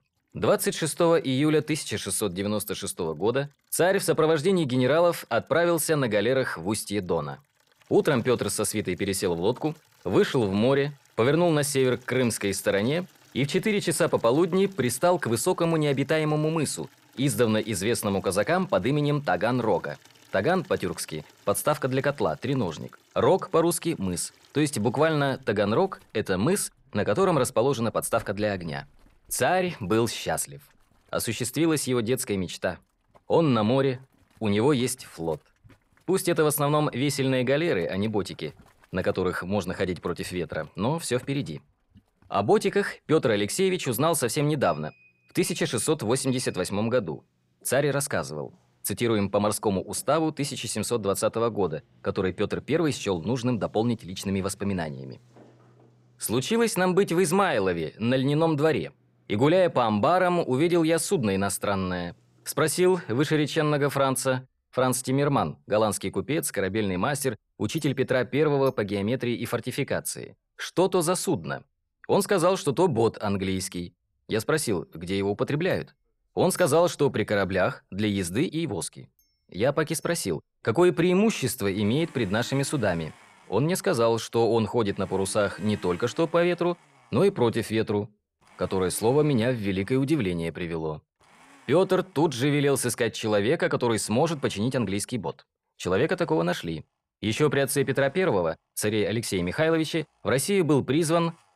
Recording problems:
household noises; faint; throughout; 30 dB below the speech

